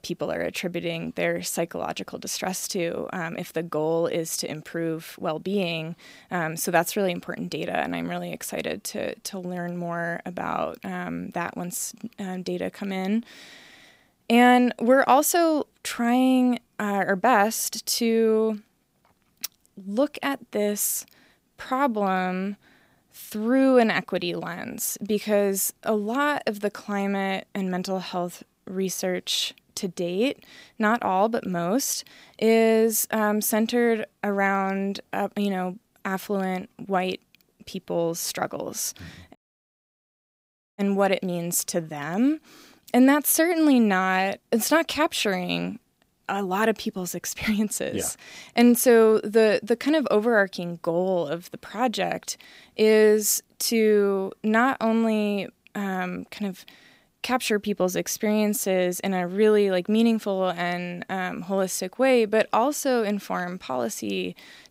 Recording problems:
audio cutting out; at 39 s for 1.5 s

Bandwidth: 15.5 kHz